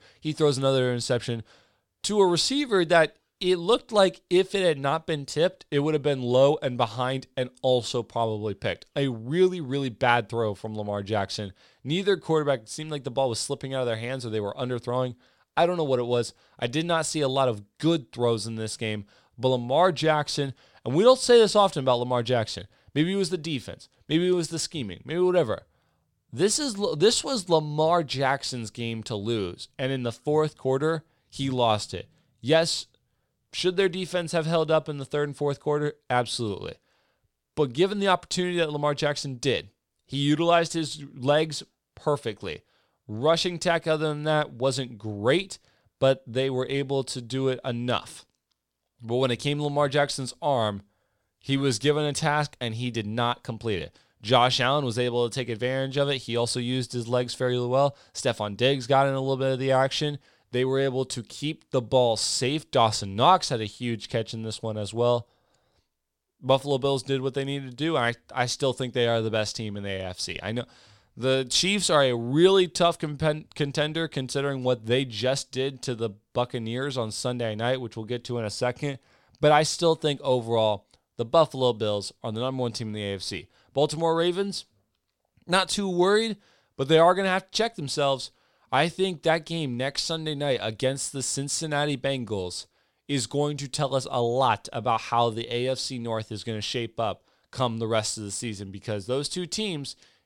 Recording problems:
none

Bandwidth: 17 kHz